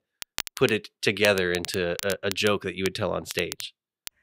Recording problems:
crackle, like an old record; noticeable; 10 dB below the speech

